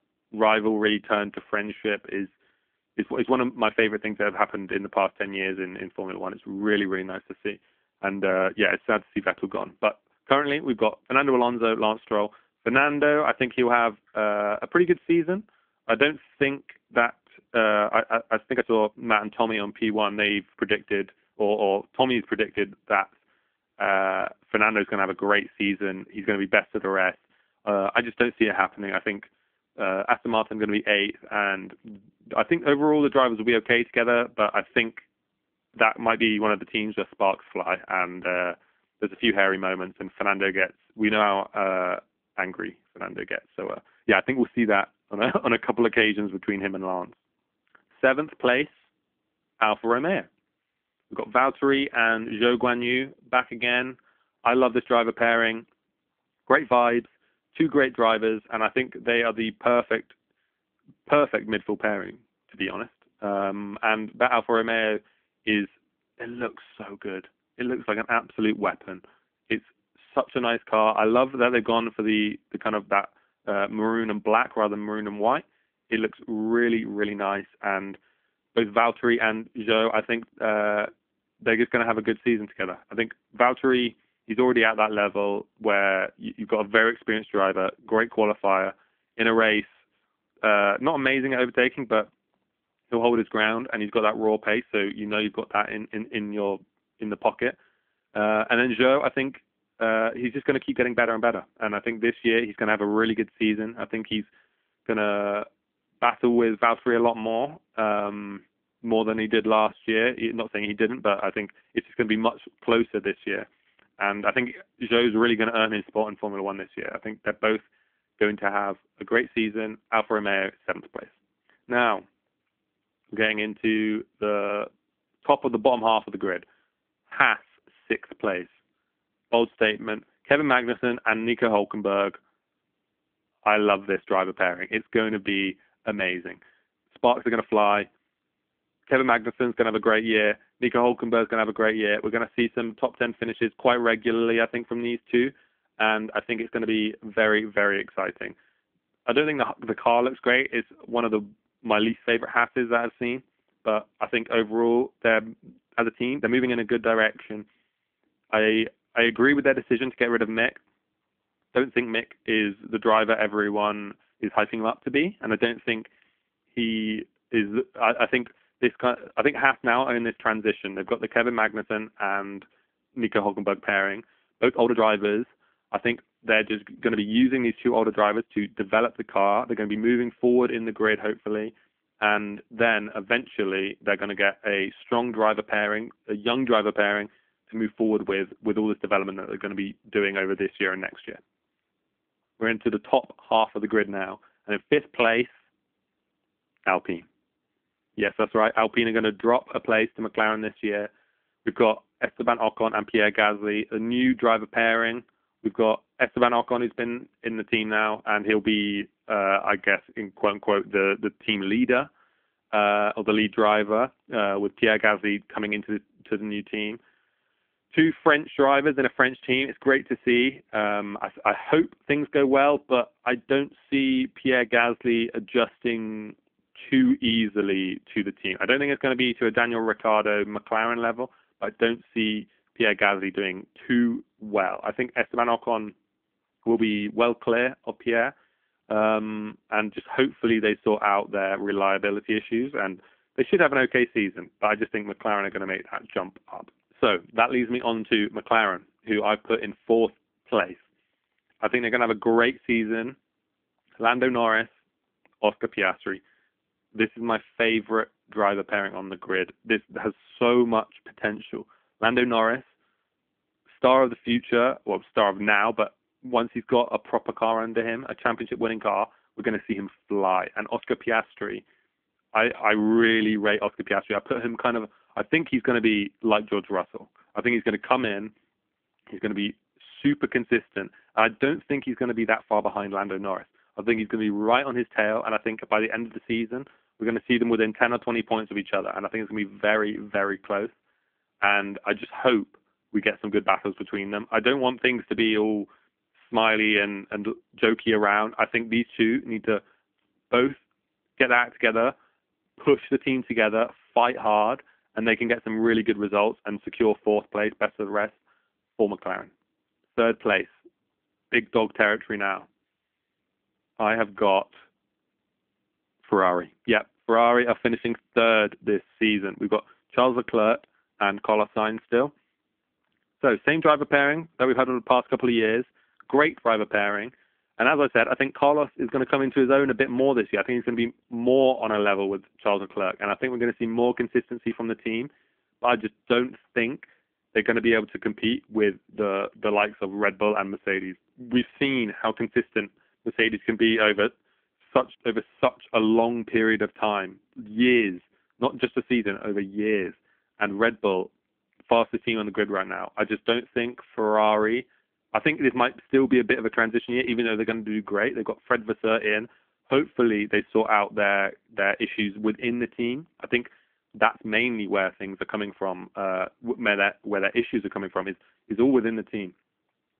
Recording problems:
phone-call audio; nothing above 3.5 kHz
uneven, jittery; strongly; from 12 s to 5:54

